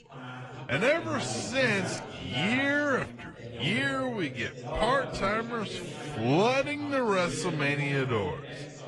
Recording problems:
wrong speed, natural pitch; too slow; 0.6 times normal speed
garbled, watery; slightly
background chatter; noticeable; throughout; 3 voices, 10 dB below the speech

